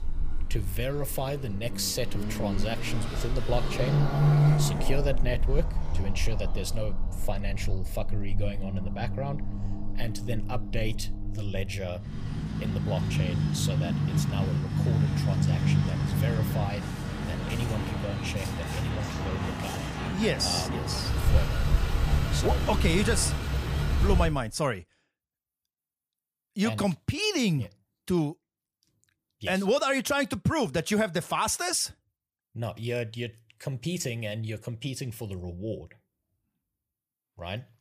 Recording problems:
traffic noise; very loud; until 24 s; 2 dB above the speech

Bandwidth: 15 kHz